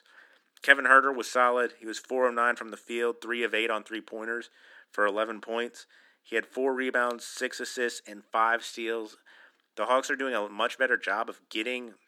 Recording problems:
thin; somewhat; fading below 250 Hz

